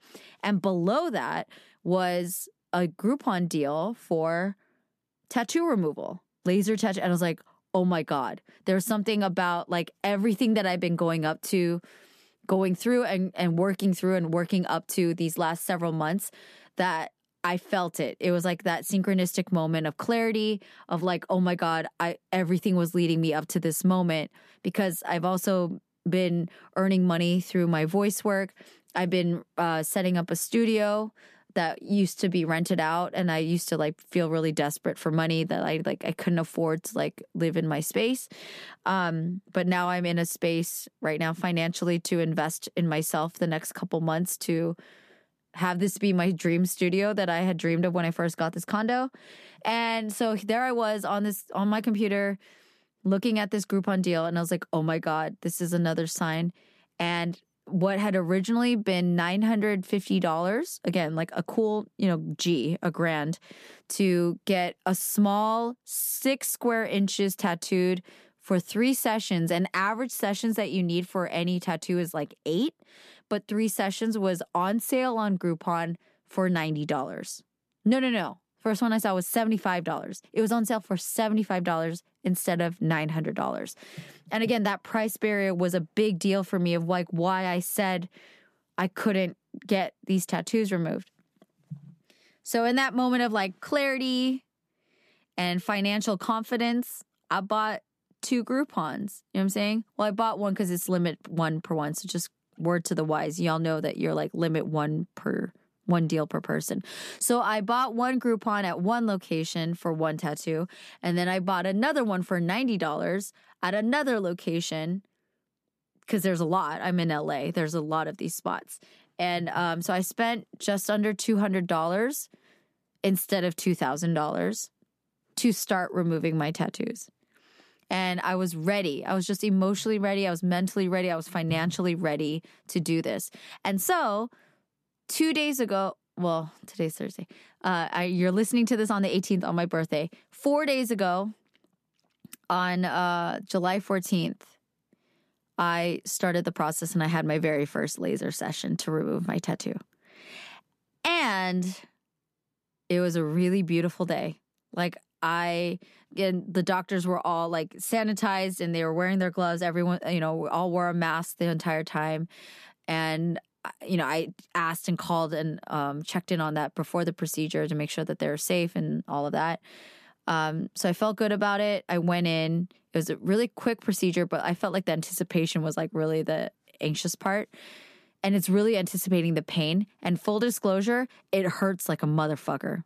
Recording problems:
none

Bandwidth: 14.5 kHz